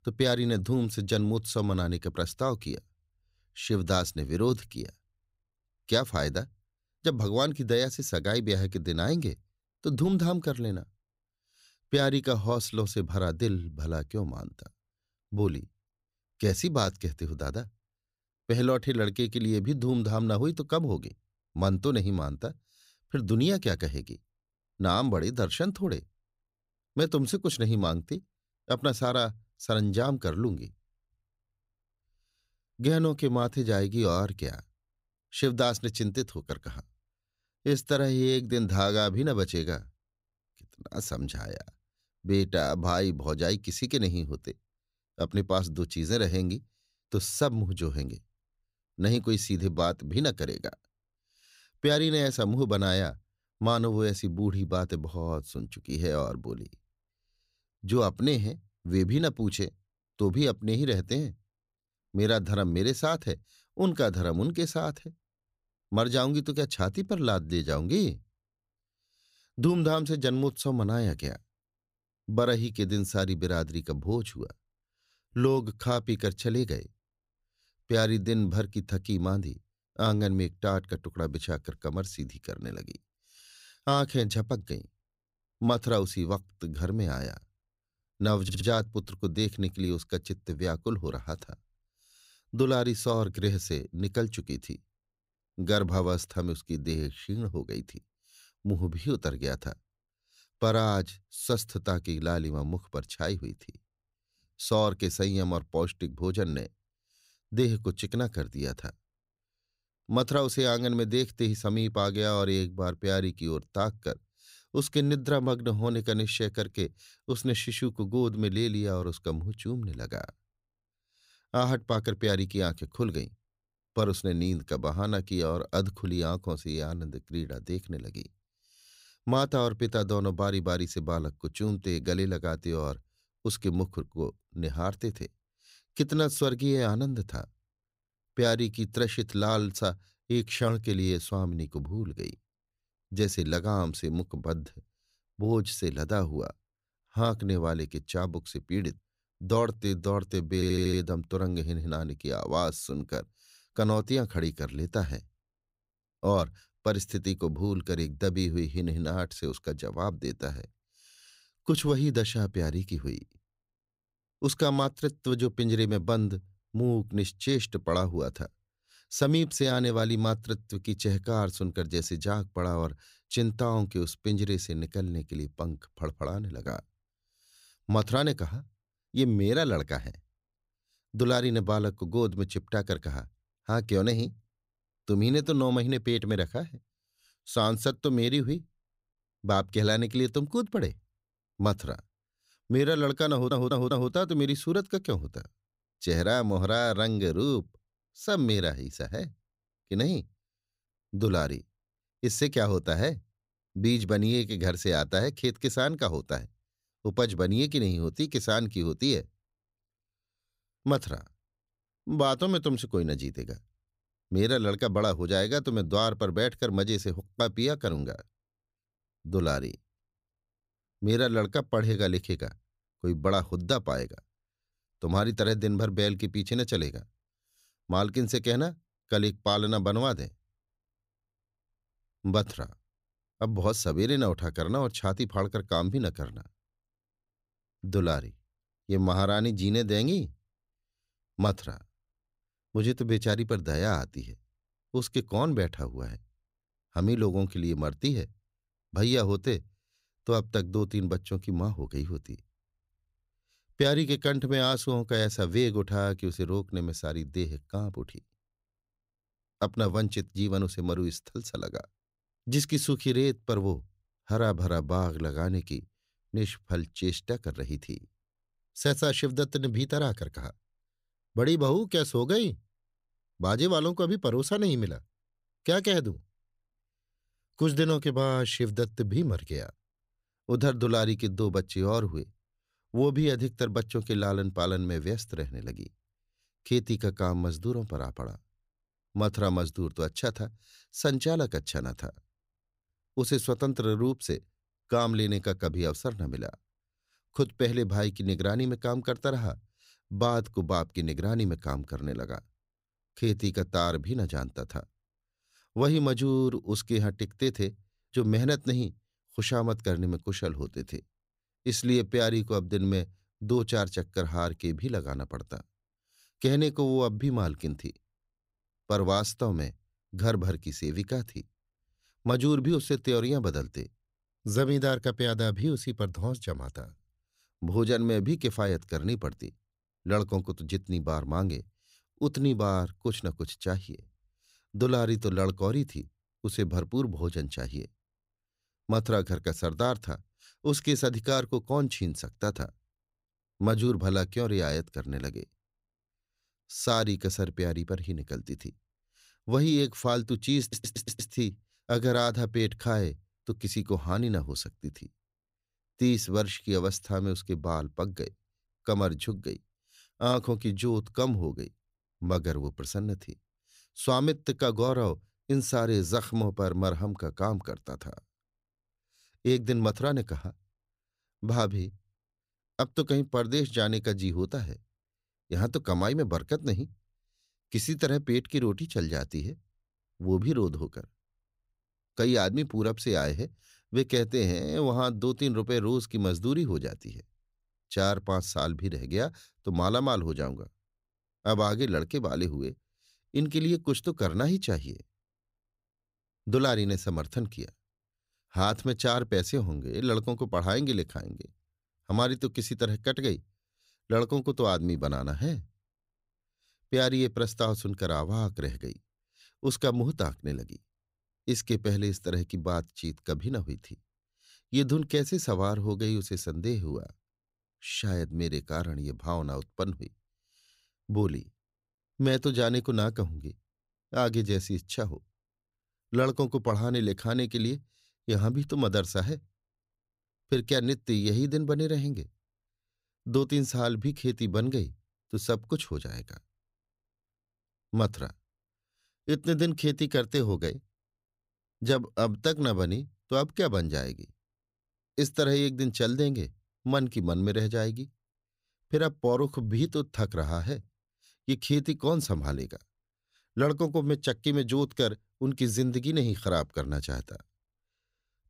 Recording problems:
audio stuttering; 4 times, first at 1:28

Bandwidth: 15.5 kHz